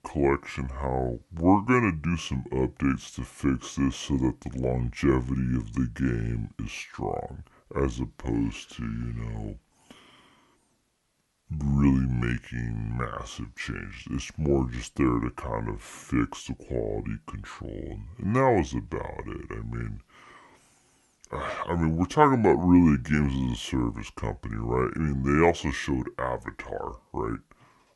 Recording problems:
wrong speed and pitch; too slow and too low; 0.7 times normal speed

